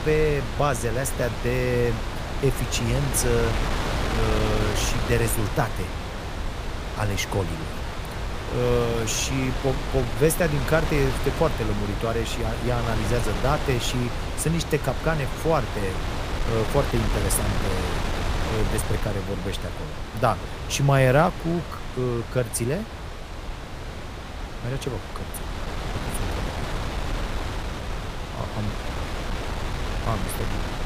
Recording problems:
wind noise on the microphone; heavy; 5 dB below the speech

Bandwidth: 15 kHz